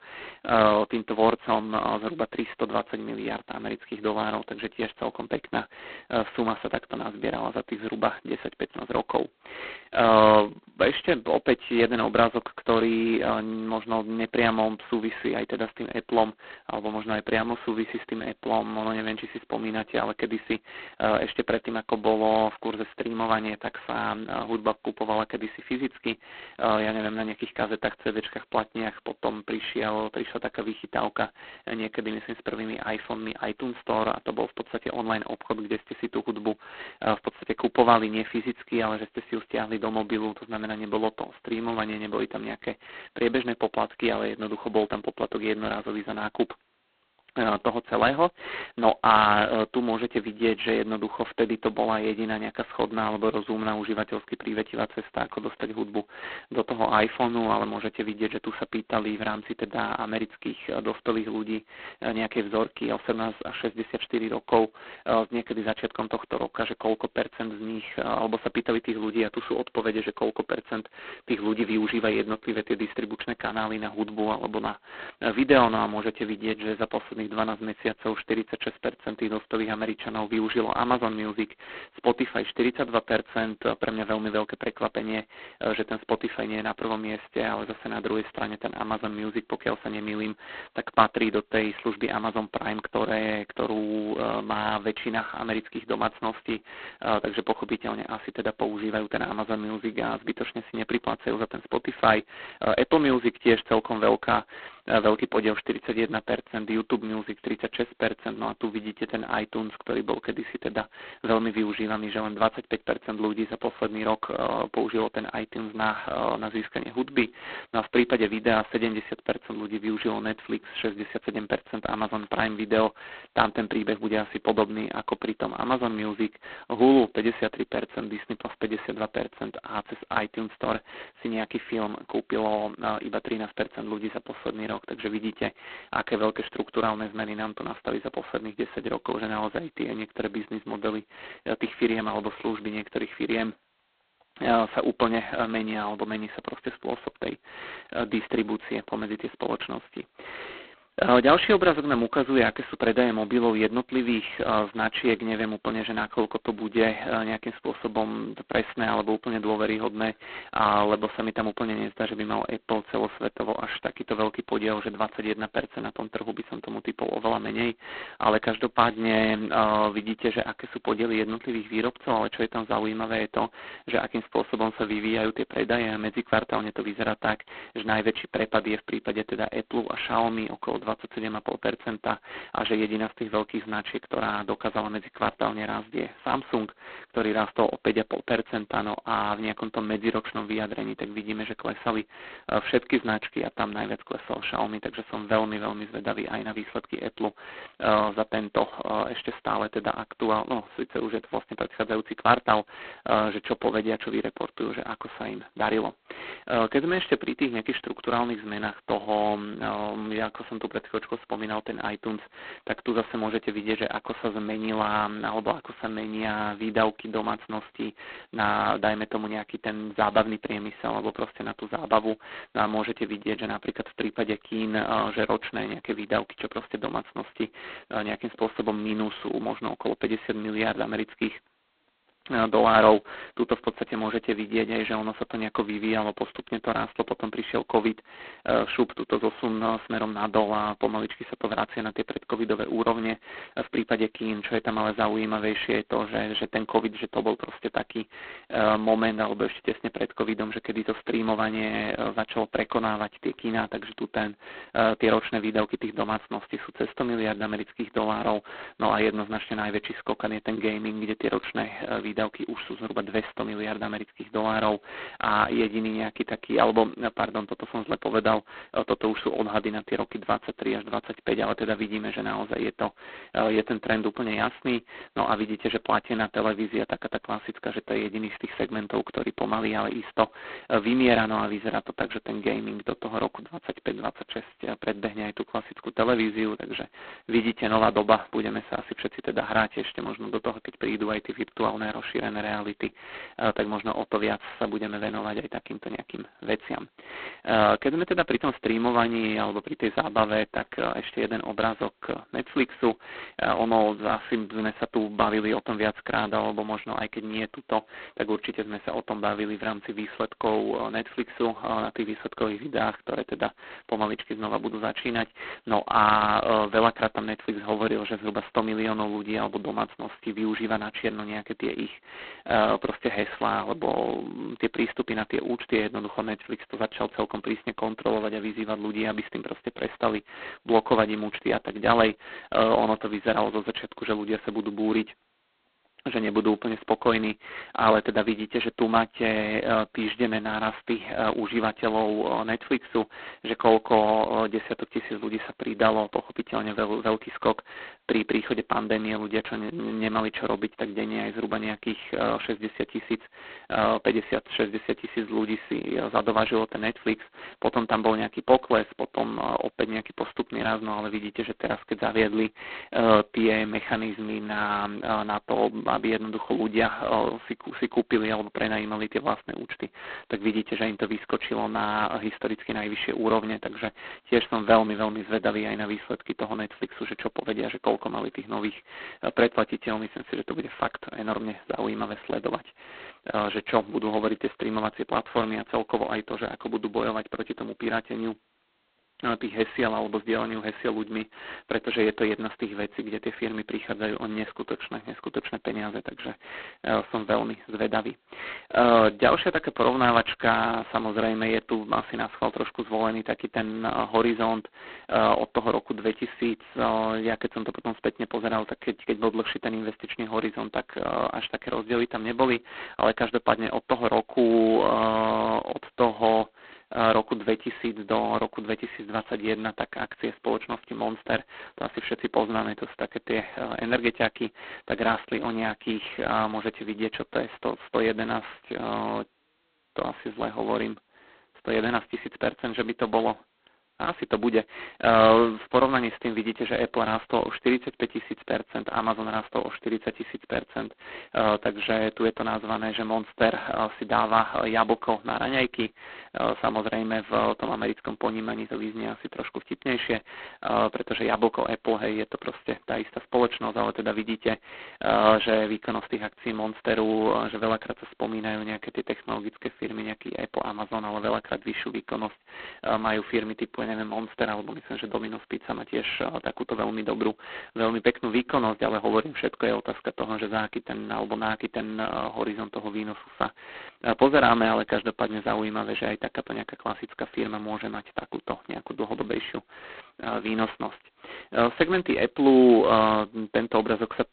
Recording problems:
phone-call audio; poor line; nothing above 4 kHz

